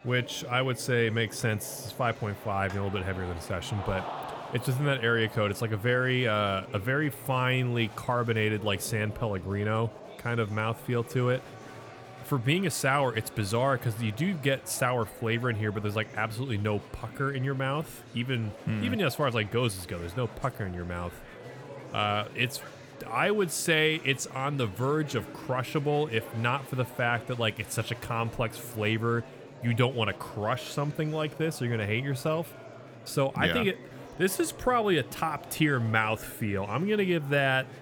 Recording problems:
murmuring crowd; noticeable; throughout; 15 dB below the speech

